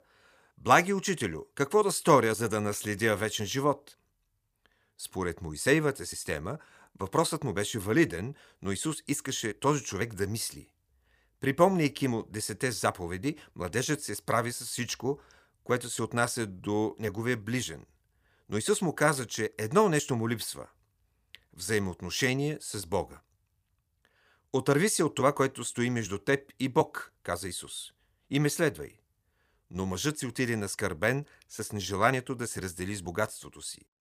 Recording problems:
none

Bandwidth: 15 kHz